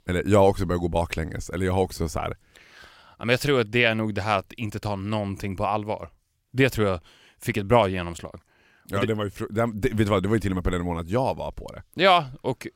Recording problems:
none

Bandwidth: 16 kHz